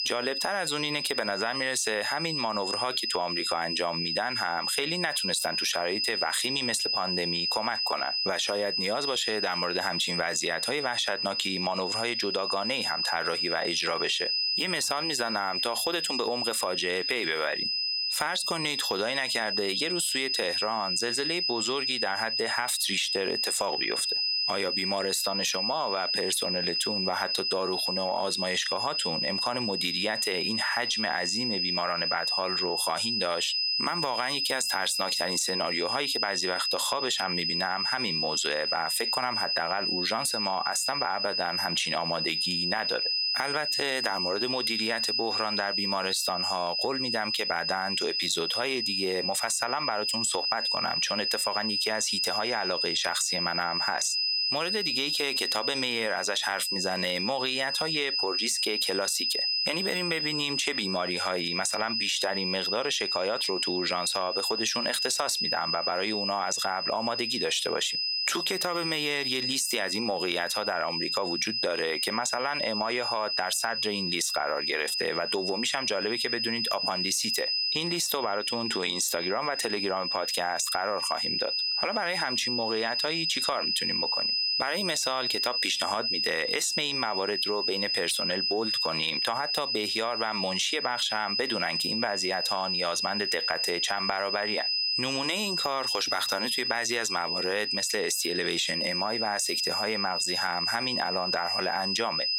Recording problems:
squashed, flat; heavily
thin; very slightly; fading below 400 Hz
high-pitched whine; loud; throughout; 5 kHz, as loud as the speech

